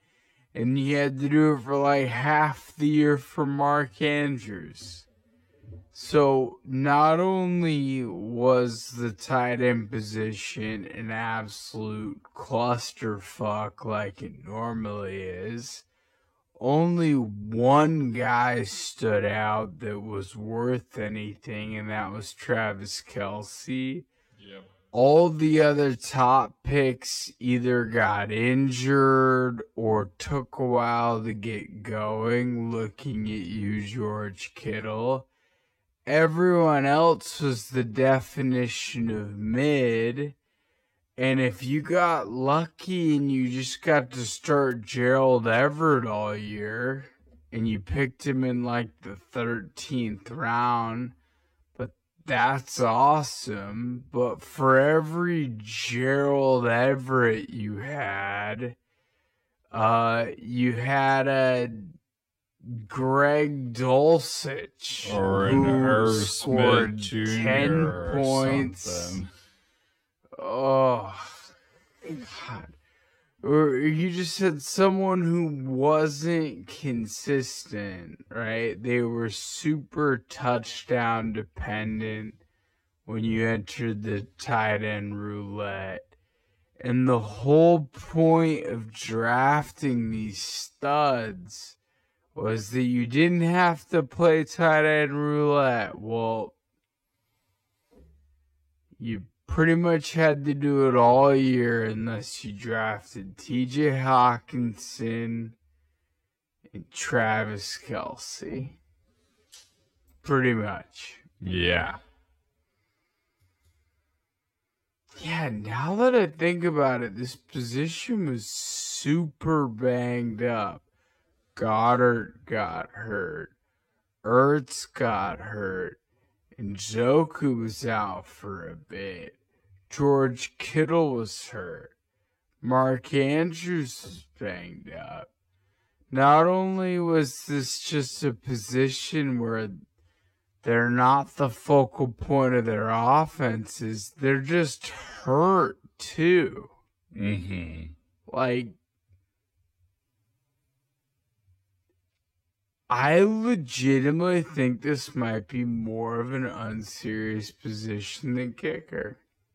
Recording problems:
wrong speed, natural pitch; too slow; 0.5 times normal speed

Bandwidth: 16.5 kHz